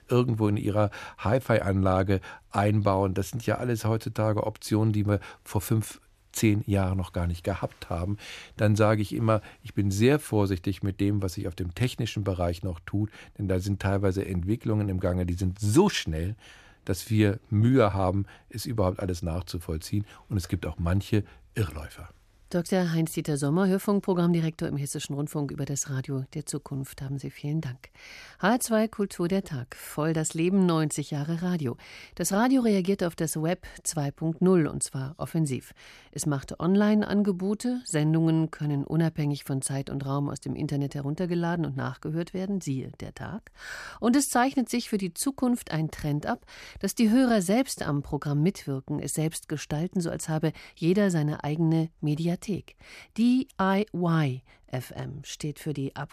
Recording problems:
none

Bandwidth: 14.5 kHz